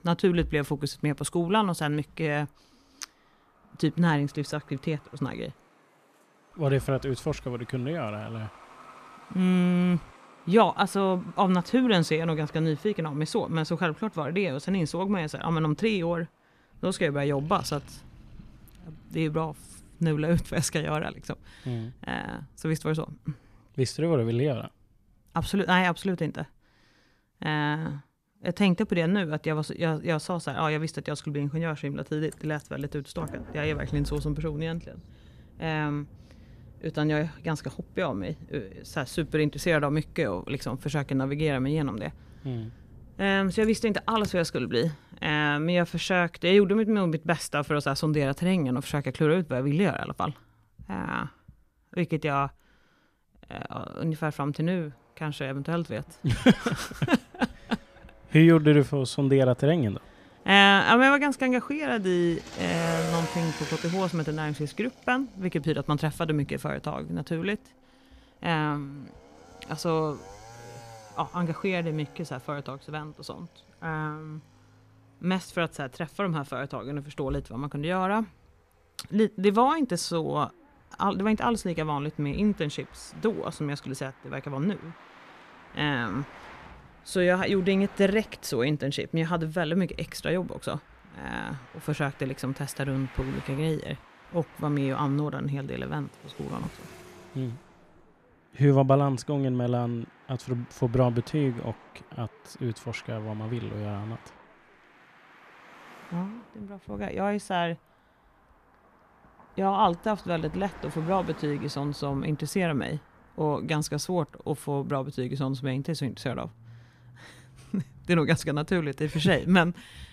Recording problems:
traffic noise; noticeable; throughout; 20 dB below the speech

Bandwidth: 14.5 kHz